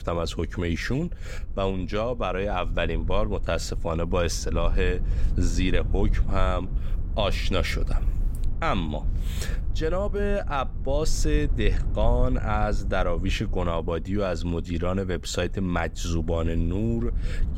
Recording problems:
low rumble; noticeable; throughout; 20 dB below the speech

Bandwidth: 16 kHz